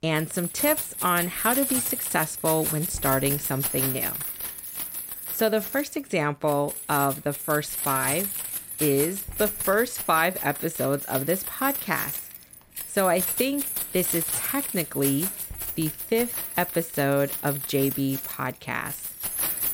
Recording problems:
household noises; loud; throughout; 2 dB below the speech

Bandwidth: 16 kHz